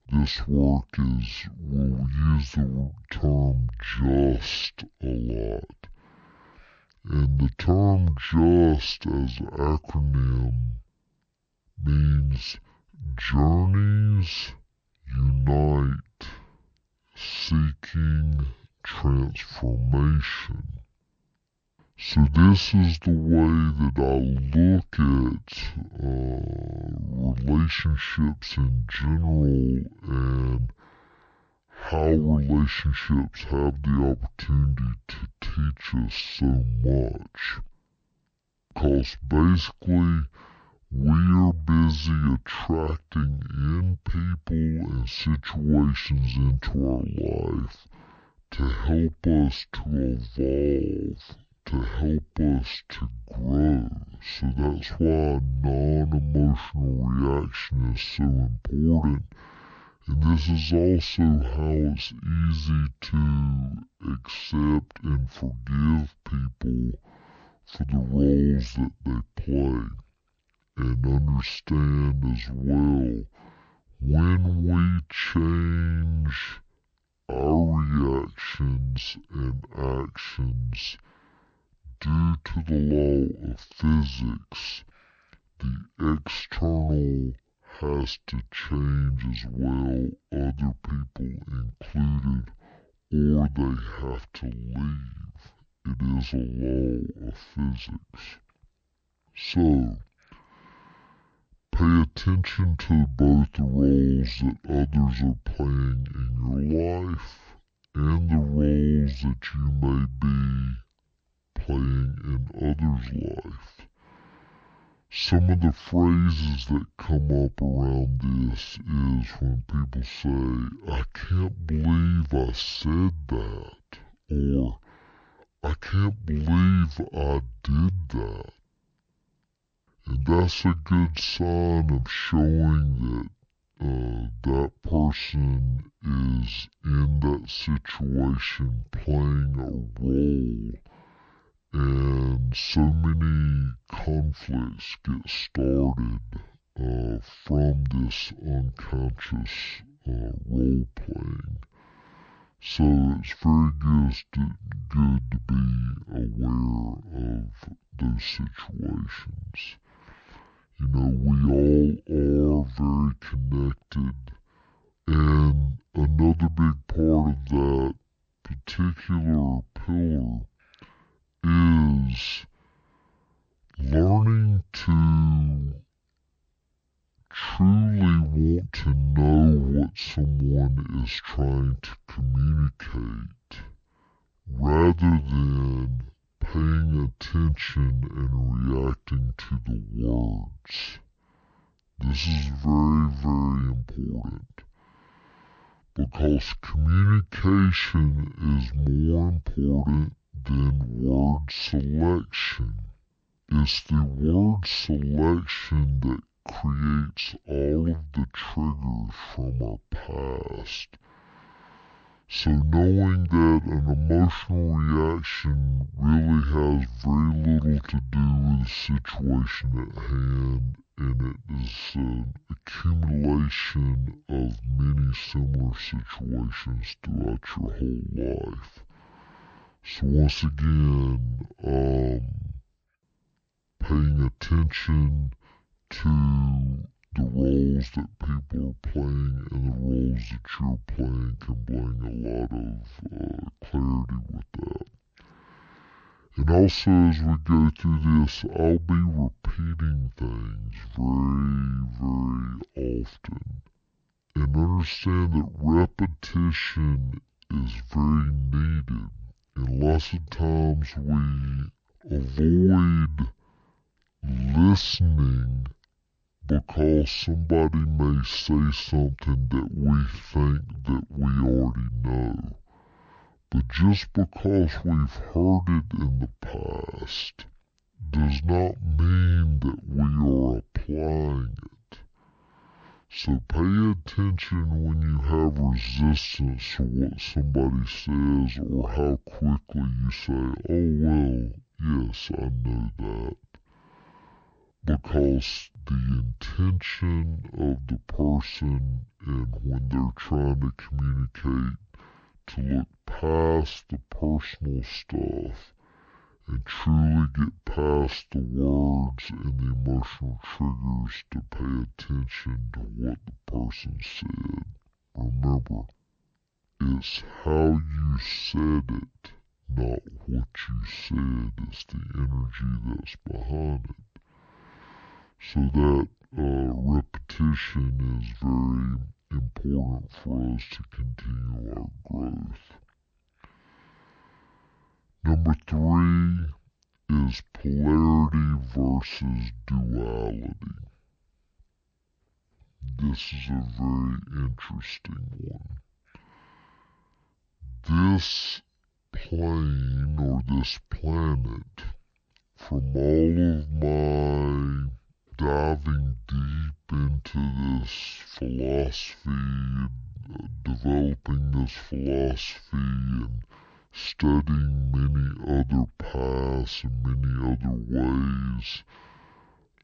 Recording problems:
wrong speed and pitch; too slow and too low; 0.5 times normal speed

